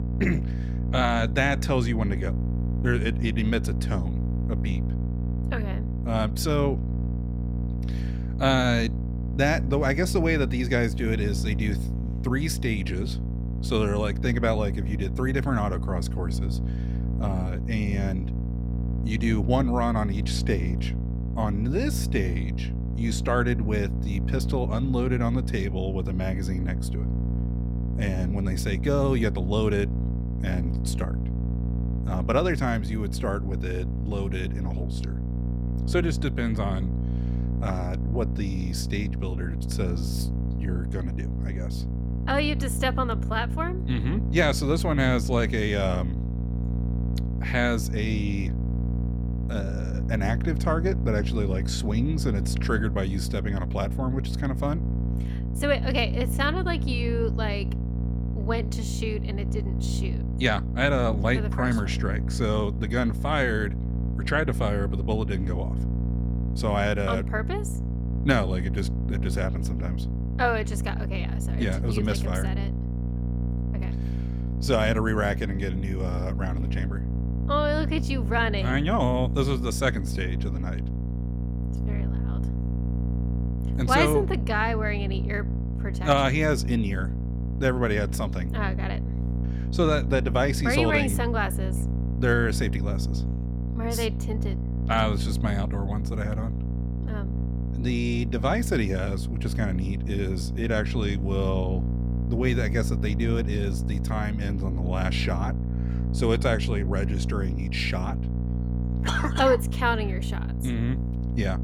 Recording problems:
electrical hum; noticeable; throughout; 60 Hz, 10 dB below the speech

